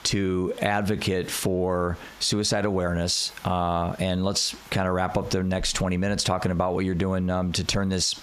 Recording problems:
squashed, flat; heavily

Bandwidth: 14.5 kHz